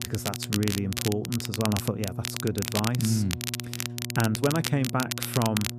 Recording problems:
crackle, like an old record; loud; 4 dB below the speech
electrical hum; noticeable; throughout; 60 Hz, 15 dB below the speech

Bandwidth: 14.5 kHz